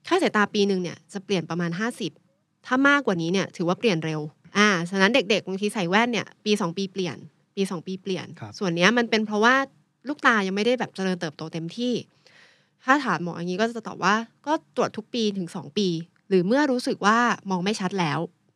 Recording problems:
none

